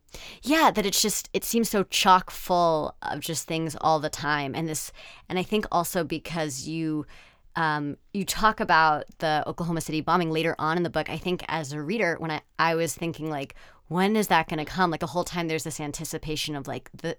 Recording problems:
uneven, jittery; strongly; from 1.5 to 15 s

